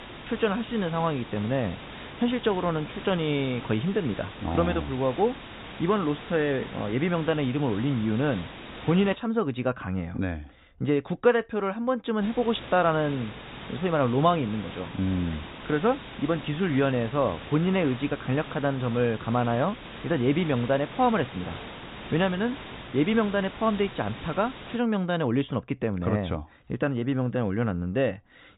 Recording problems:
high frequencies cut off; severe; nothing above 4 kHz
hiss; noticeable; until 9 s and from 12 to 25 s; 15 dB below the speech

